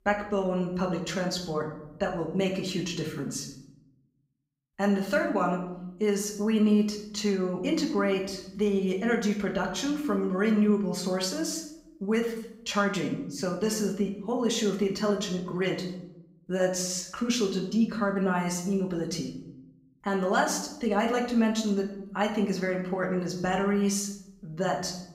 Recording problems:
room echo; slight; dies away in 0.7 s
off-mic speech; somewhat distant

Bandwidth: 15.5 kHz